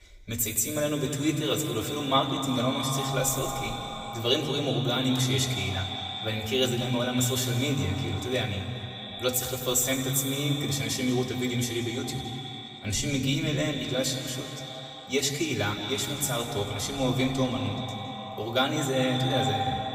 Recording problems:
echo of what is said; strong; throughout; 190 ms later, 8 dB below the speech
room echo; slight; dies away in 2.3 s
off-mic speech; somewhat distant

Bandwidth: 15.5 kHz